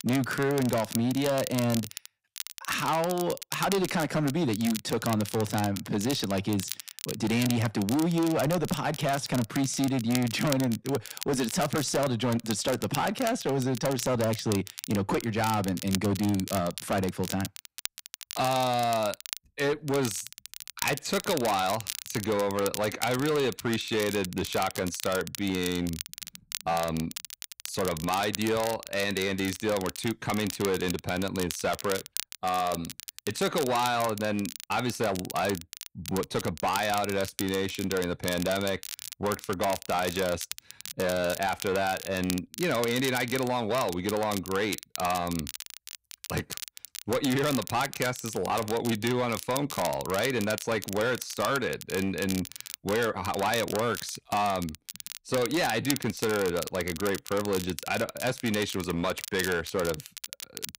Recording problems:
distortion; slight; 12% of the sound clipped
crackle, like an old record; loud; 10 dB below the speech

